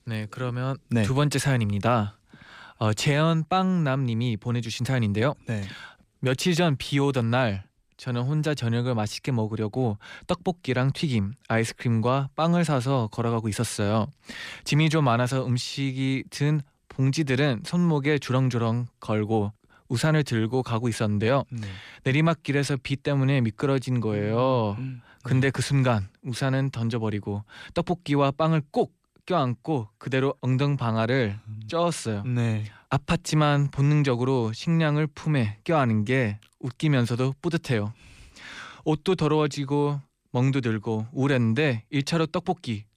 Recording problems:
none

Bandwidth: 15 kHz